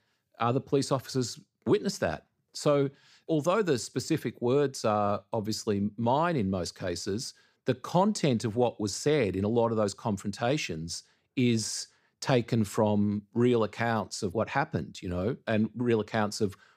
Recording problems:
none

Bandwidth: 15 kHz